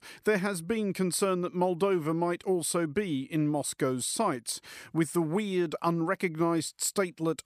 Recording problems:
none

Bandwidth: 14.5 kHz